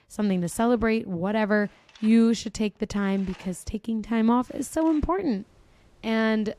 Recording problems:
machinery noise; faint; throughout; 30 dB below the speech

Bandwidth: 13.5 kHz